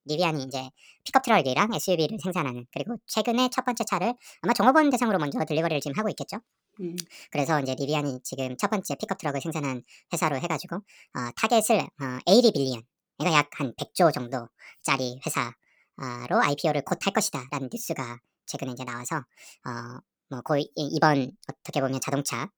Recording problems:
wrong speed and pitch; too fast and too high; 1.5 times normal speed

